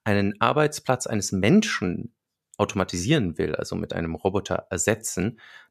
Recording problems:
none

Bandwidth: 14.5 kHz